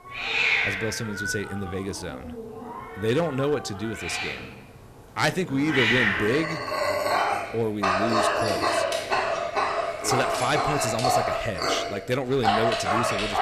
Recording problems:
animal sounds; very loud; throughout; 3 dB above the speech

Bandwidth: 14 kHz